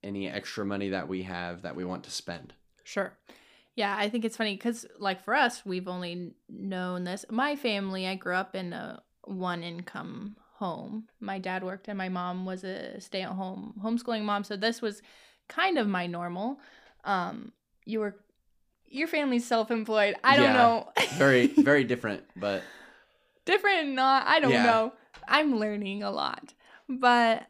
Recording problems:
none

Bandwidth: 15 kHz